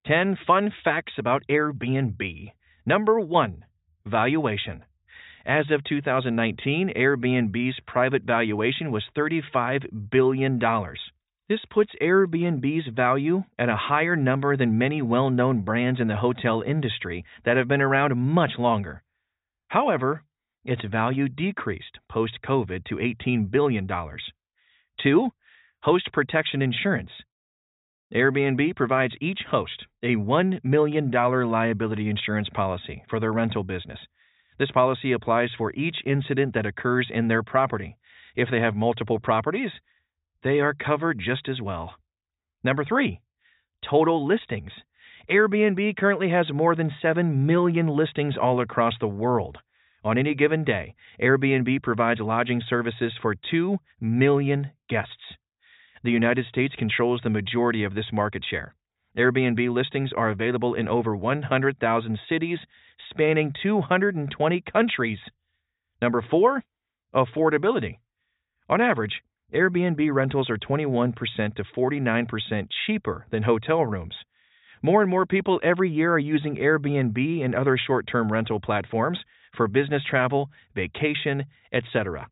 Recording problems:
high frequencies cut off; severe; nothing above 4 kHz

